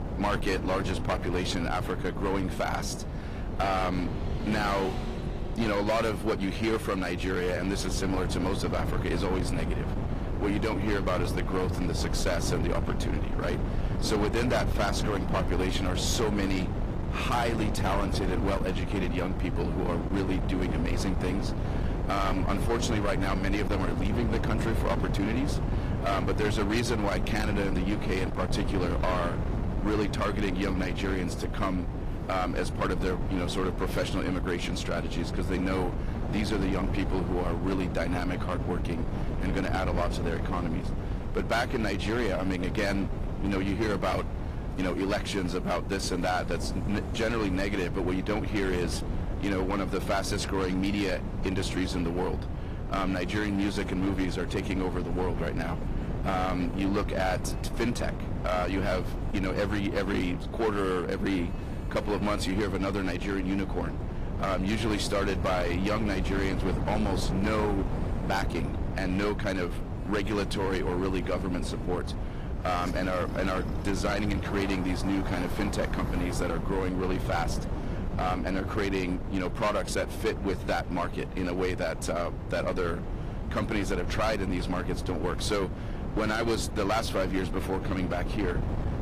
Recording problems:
distortion; slight; 10% of the sound clipped
garbled, watery; slightly; nothing above 14.5 kHz
wind noise on the microphone; heavy; 9 dB below the speech
traffic noise; faint; throughout; 20 dB below the speech

